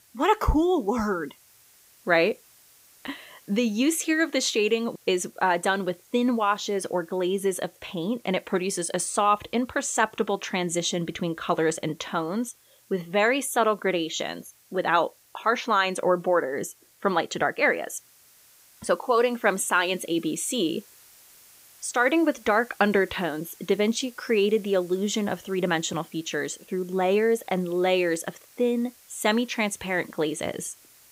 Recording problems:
hiss; faint; throughout; 25 dB below the speech

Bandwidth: 15.5 kHz